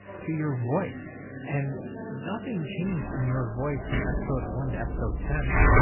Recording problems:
garbled, watery; badly; nothing above 3 kHz
household noises; very loud; throughout; as loud as the speech
background chatter; loud; throughout; 3 voices, 9 dB below the speech
electrical hum; faint; throughout; 50 Hz, 25 dB below the speech

